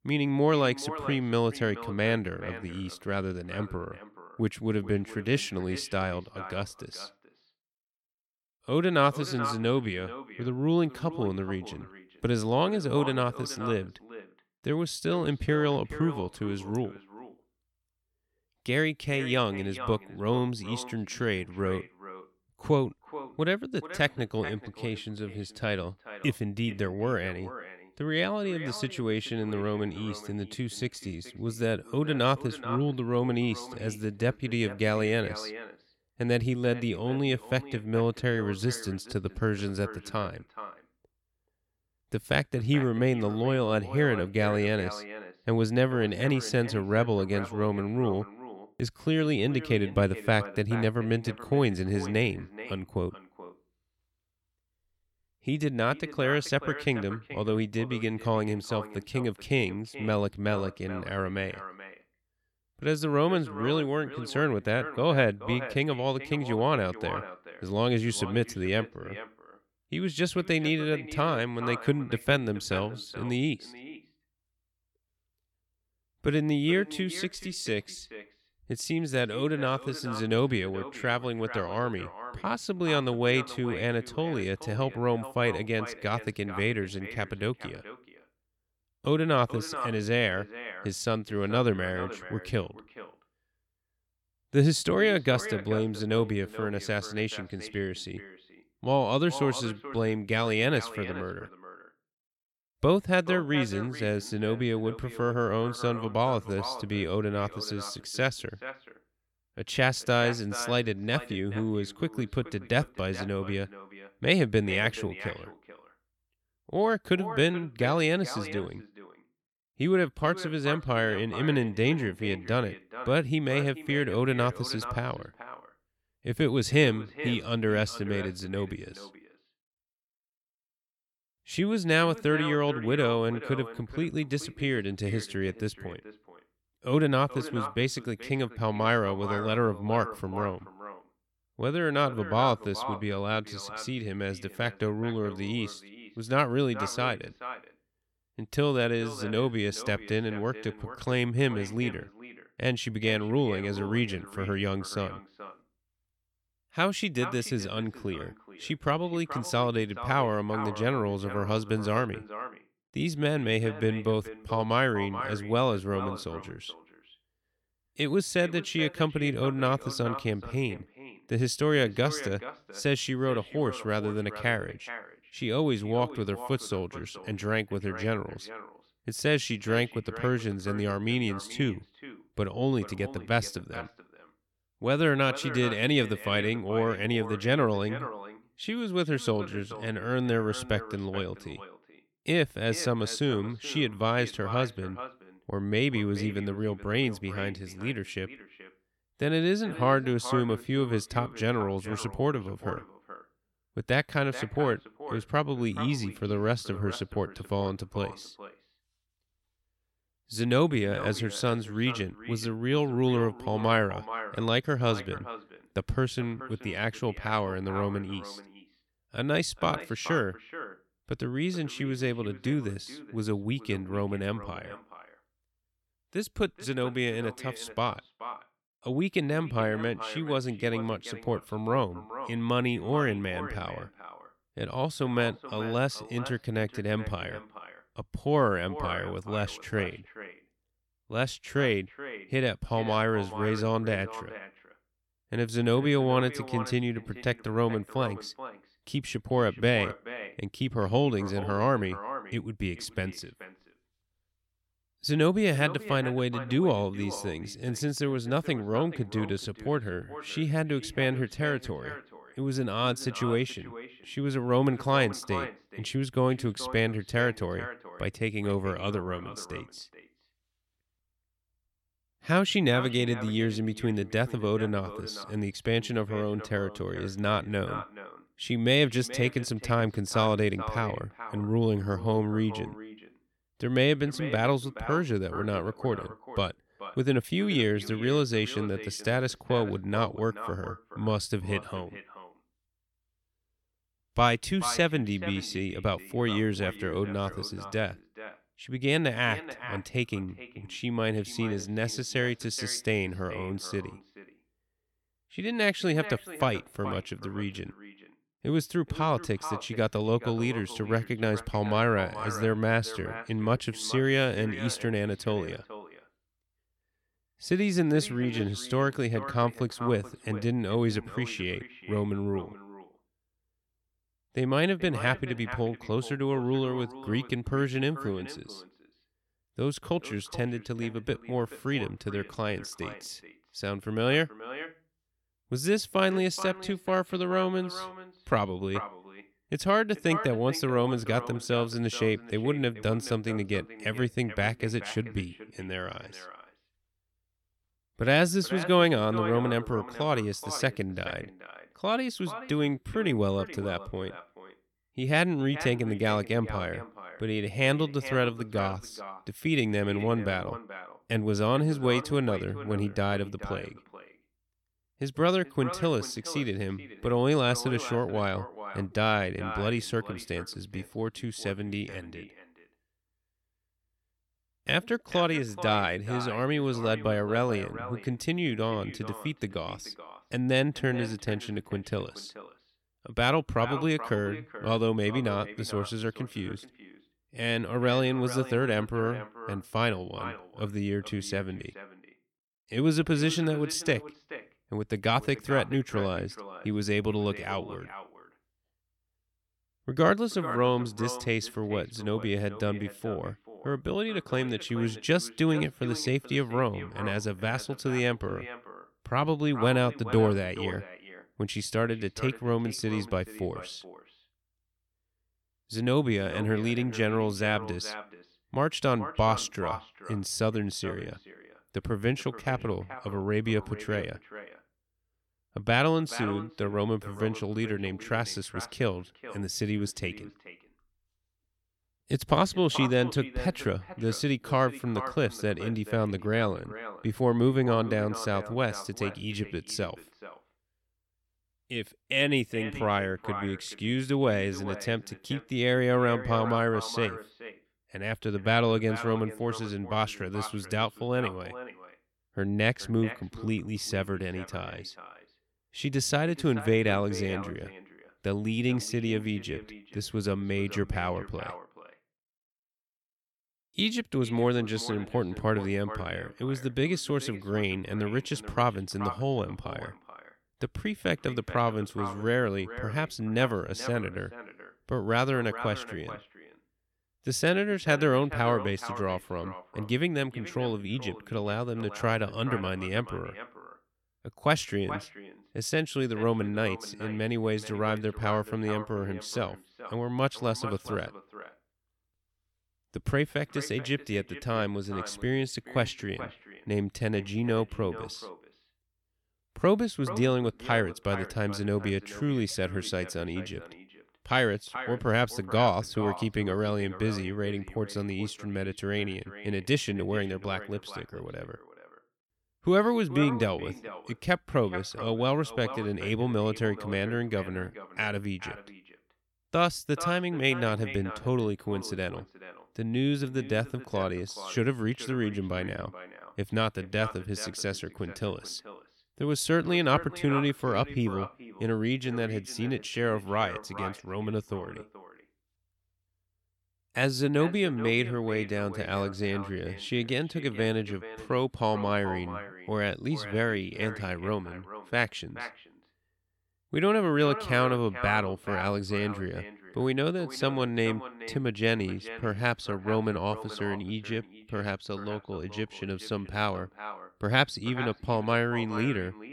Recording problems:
echo of what is said; noticeable; throughout; 430 ms later, 15 dB below the speech

